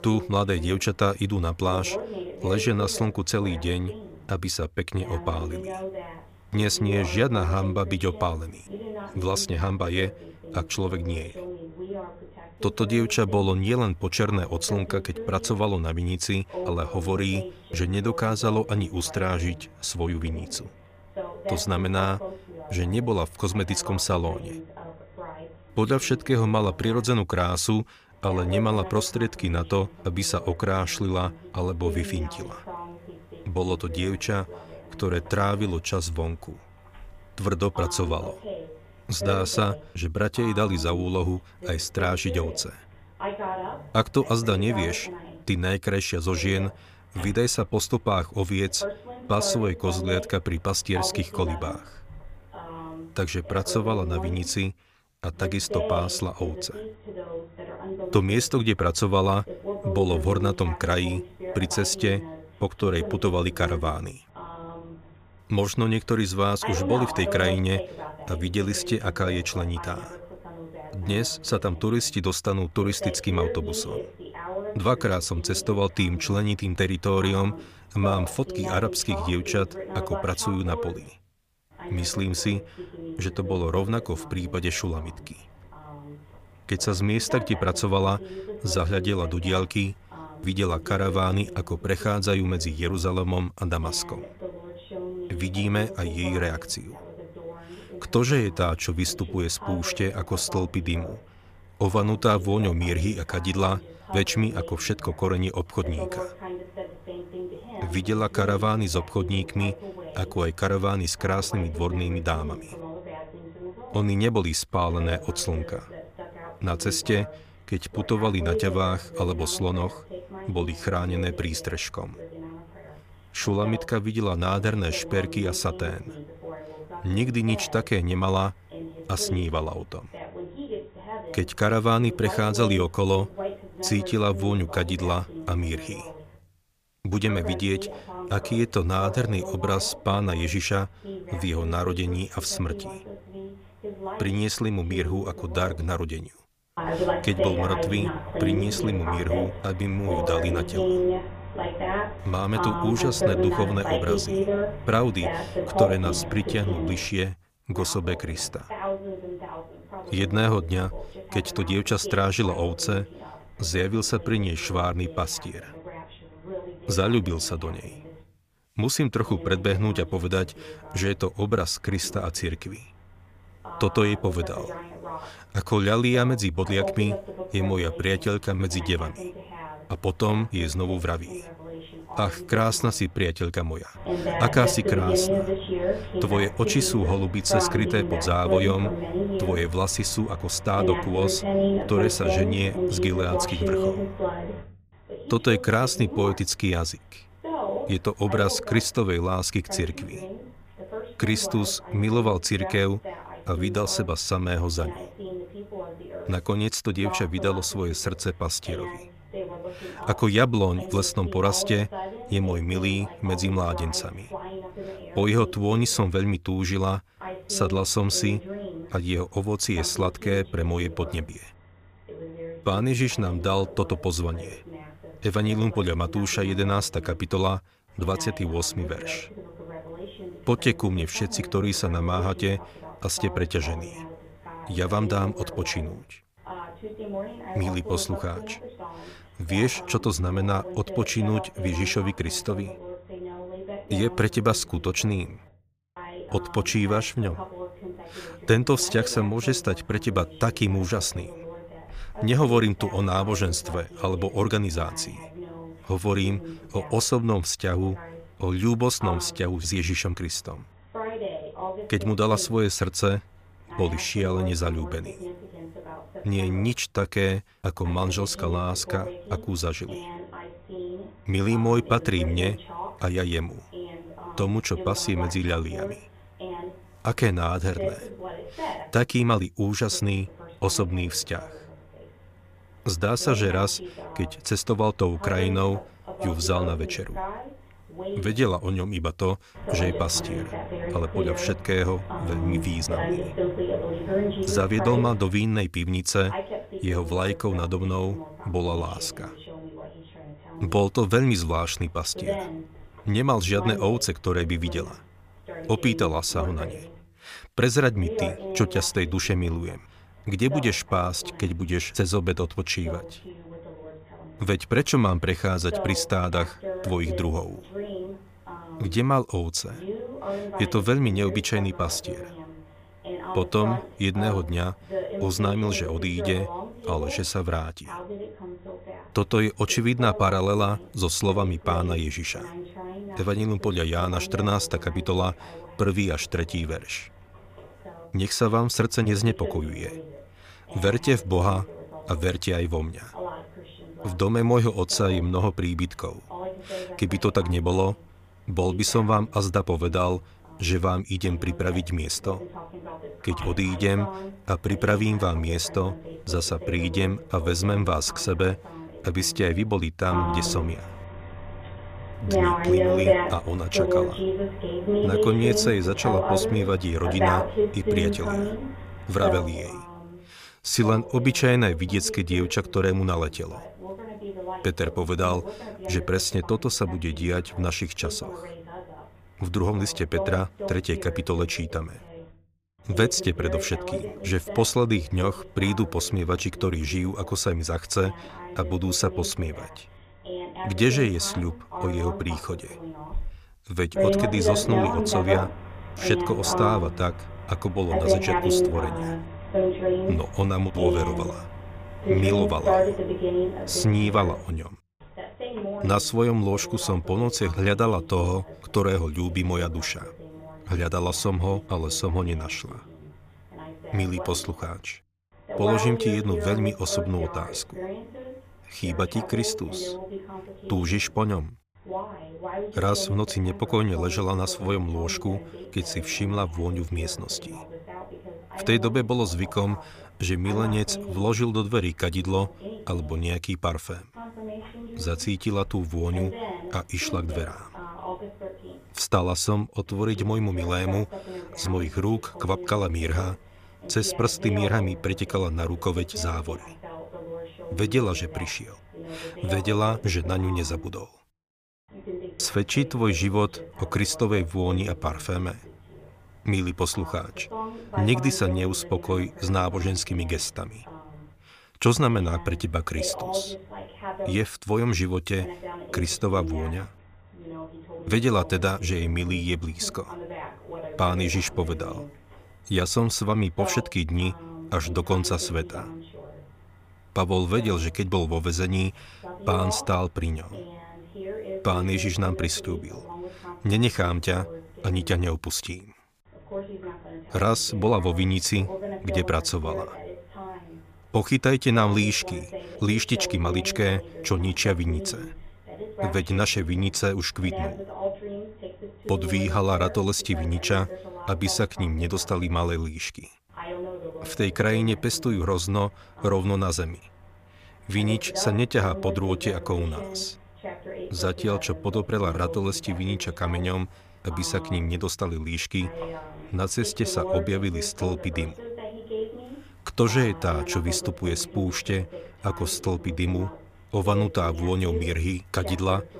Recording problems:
voice in the background; loud; throughout; 8 dB below the speech

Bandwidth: 15 kHz